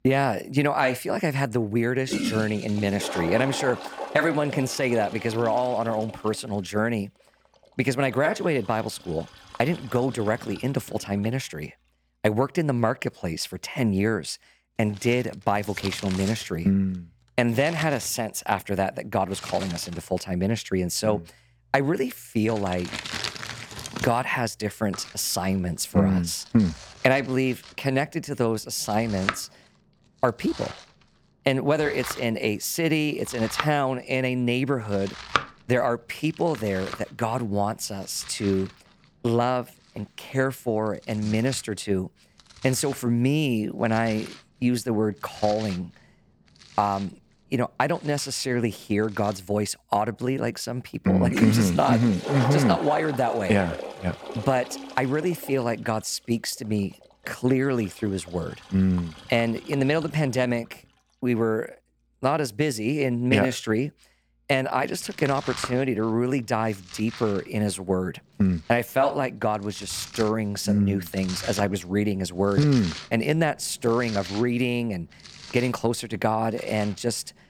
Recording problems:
household noises; noticeable; throughout; 10 dB below the speech

